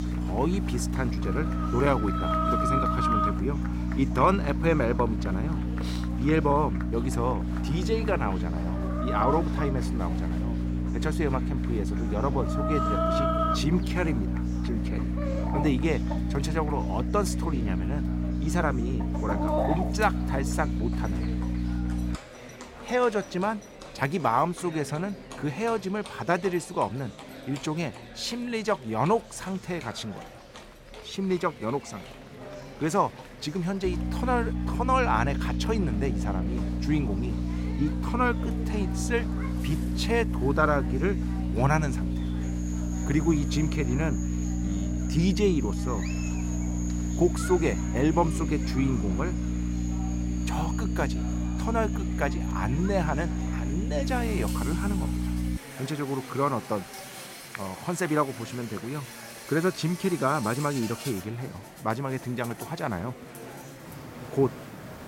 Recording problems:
electrical hum; loud; until 22 s and from 34 to 56 s; 60 Hz, 9 dB below the speech
animal sounds; loud; throughout; 8 dB below the speech
murmuring crowd; noticeable; throughout; 15 dB below the speech
train or aircraft noise; faint; throughout; 25 dB below the speech

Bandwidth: 16 kHz